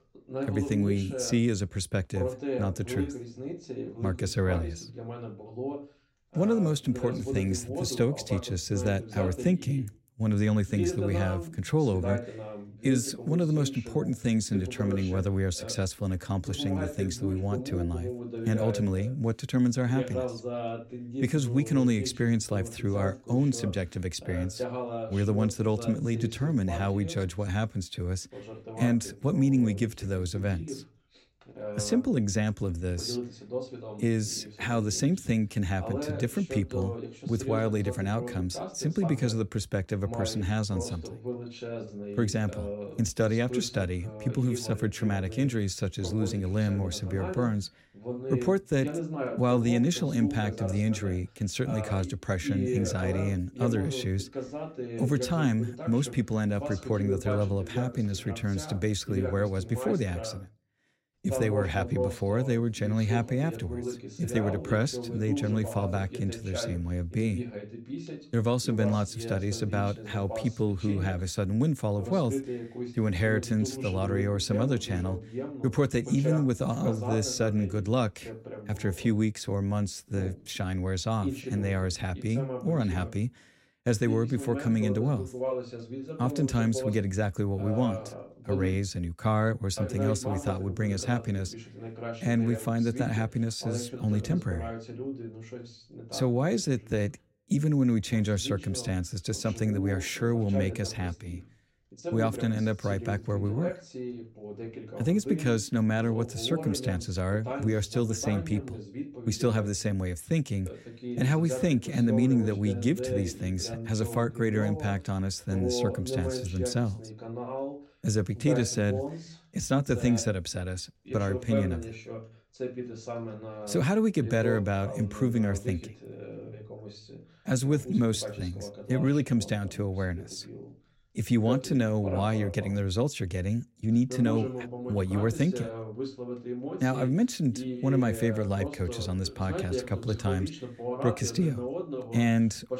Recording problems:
voice in the background; loud; throughout; 8 dB below the speech

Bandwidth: 16 kHz